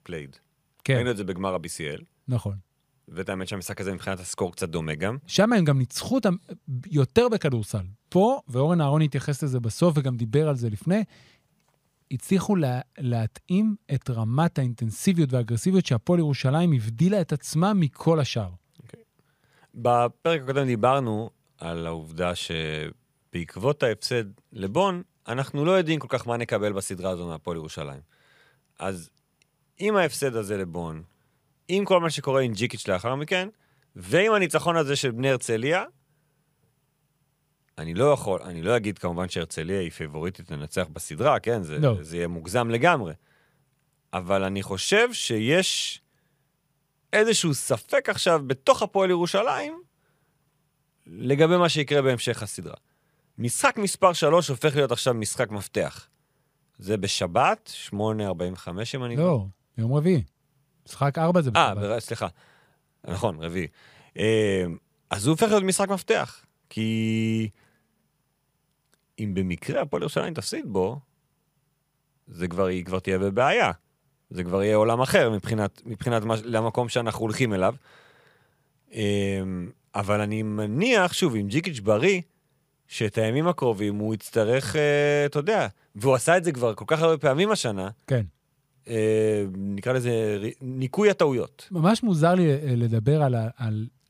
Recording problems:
none

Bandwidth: 15 kHz